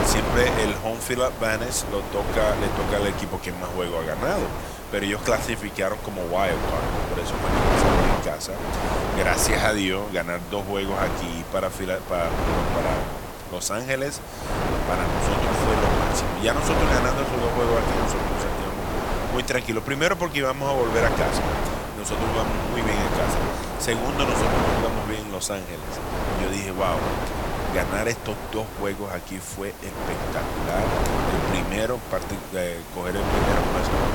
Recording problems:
wind noise on the microphone; heavy; as loud as the speech
hiss; noticeable; throughout; 15 dB below the speech

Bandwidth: 17.5 kHz